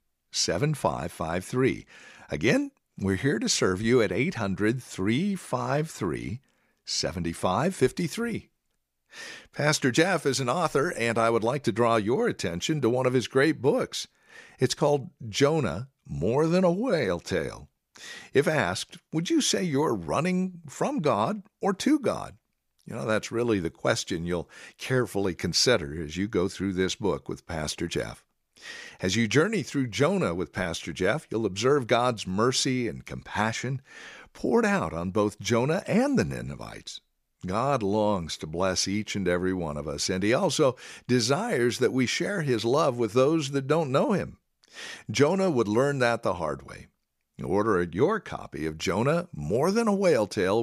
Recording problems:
abrupt cut into speech; at the end

